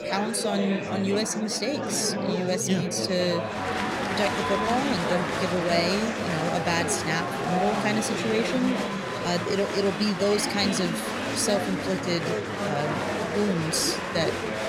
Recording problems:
chatter from many people; loud; throughout; 1 dB below the speech

